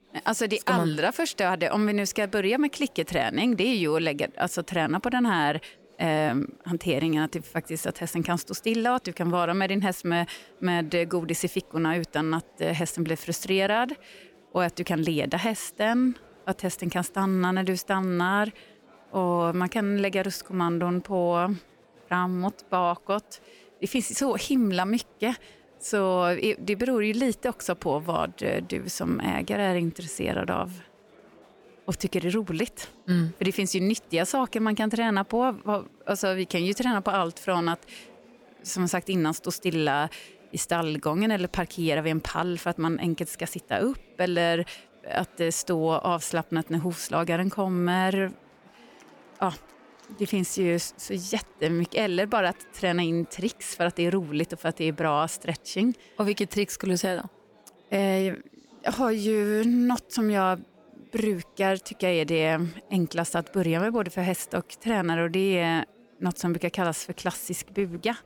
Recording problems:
chatter from many people; faint; throughout; 30 dB below the speech

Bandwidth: 18 kHz